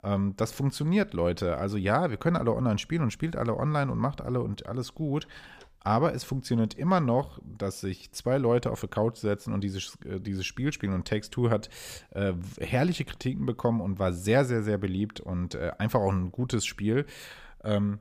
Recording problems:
none

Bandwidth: 15 kHz